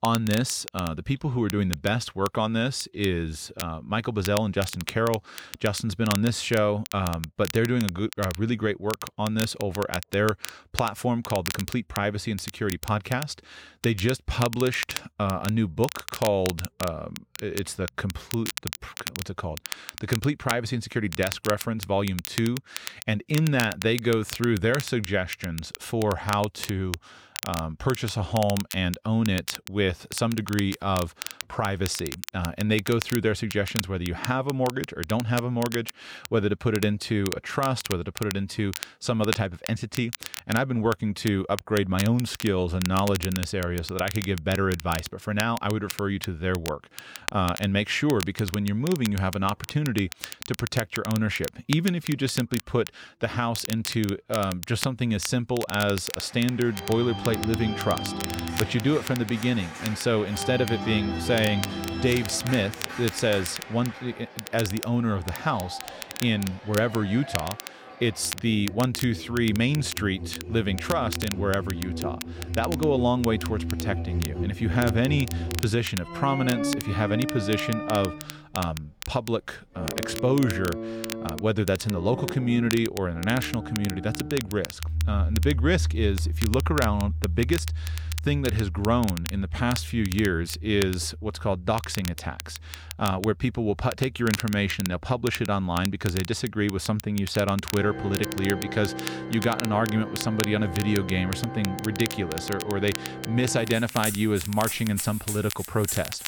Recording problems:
background music; loud; from 57 s on; 7 dB below the speech
crackle, like an old record; noticeable; 10 dB below the speech

